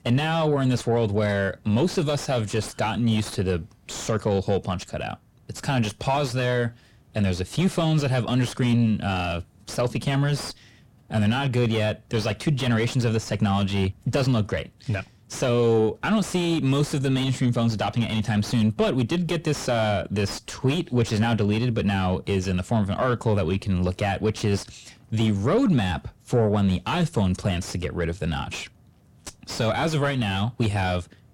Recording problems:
distortion; heavy; 7 dB below the speech

